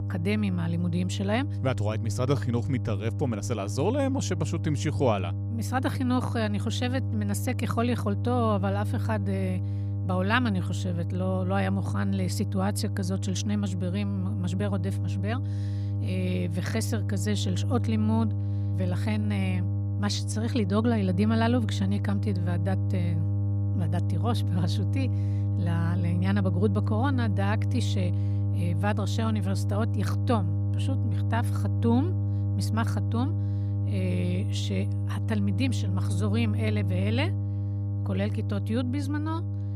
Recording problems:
electrical hum; loud; throughout; 50 Hz, 9 dB below the speech

